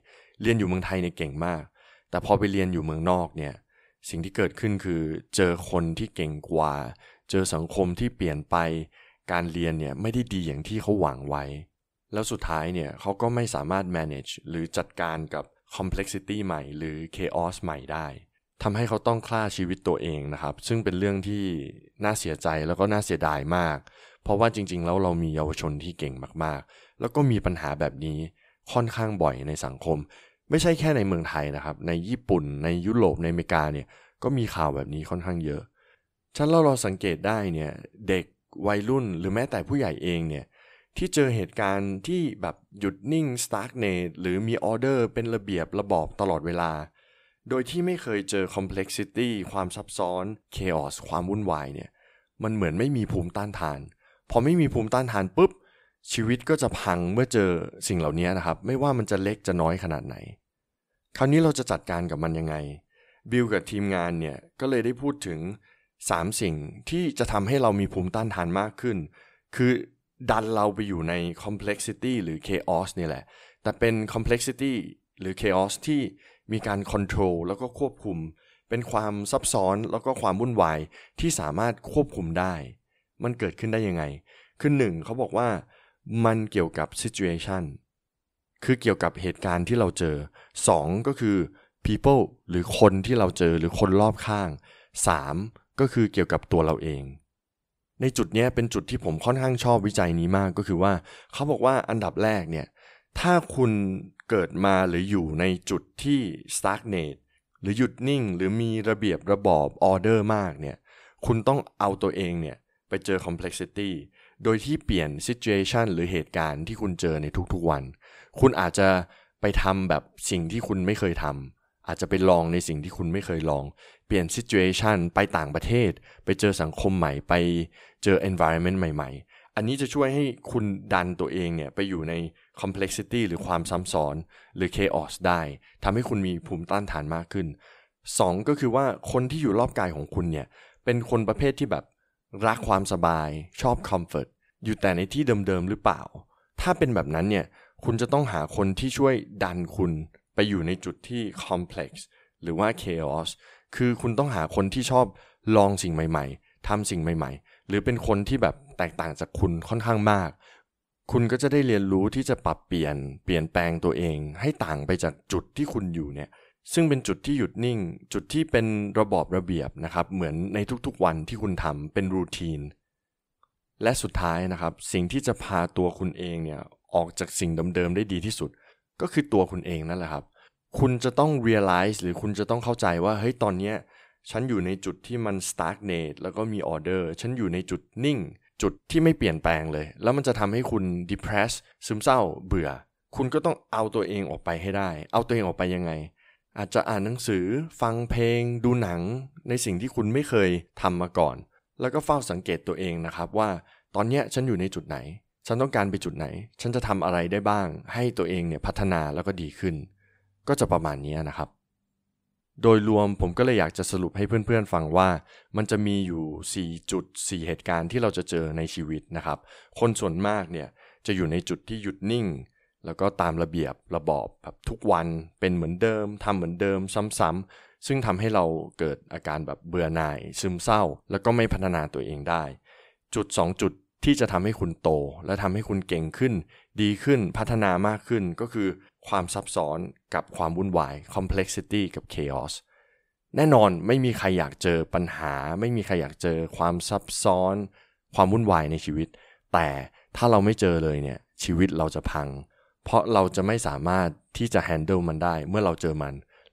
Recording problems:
none

